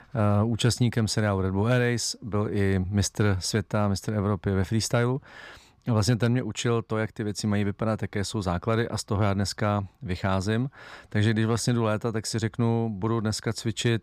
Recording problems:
none

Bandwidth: 14.5 kHz